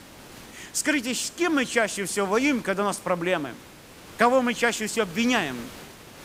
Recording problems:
hiss; noticeable; throughout; 20 dB below the speech

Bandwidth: 15.5 kHz